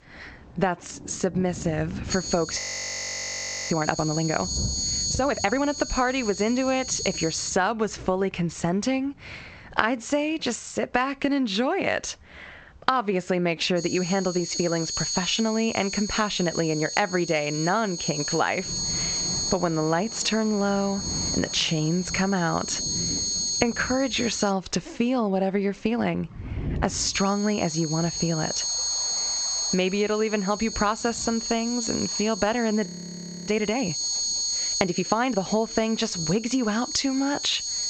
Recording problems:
garbled, watery; slightly; nothing above 7.5 kHz
squashed, flat; somewhat, background pumping
high-pitched whine; loud; from 2 to 7.5 s, from 14 to 25 s and from 27 s on; 6.5 kHz, 3 dB below the speech
rain or running water; noticeable; throughout; 15 dB below the speech
audio freezing; at 2.5 s for 1 s and at 33 s for 0.5 s

